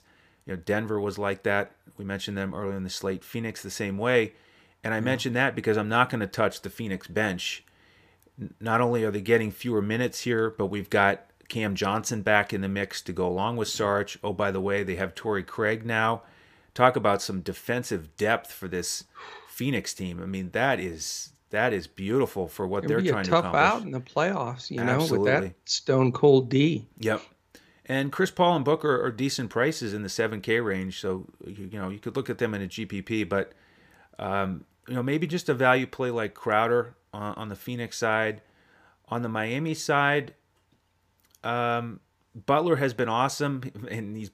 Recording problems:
none

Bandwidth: 15 kHz